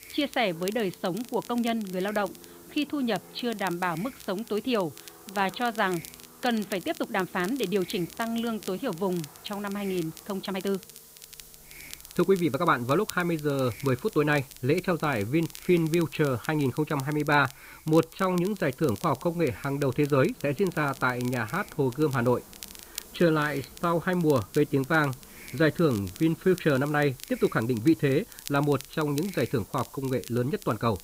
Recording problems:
high frequencies cut off; severe; nothing above 4.5 kHz
crackle, like an old record; noticeable; 20 dB below the speech
train or aircraft noise; faint; throughout; 25 dB below the speech
hiss; faint; throughout; 20 dB below the speech
uneven, jittery; strongly; from 1.5 to 31 s

